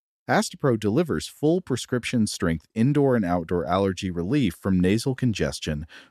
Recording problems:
none

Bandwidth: 13.5 kHz